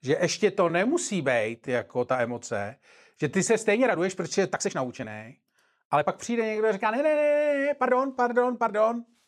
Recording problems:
uneven, jittery; strongly; from 0.5 to 8.5 s

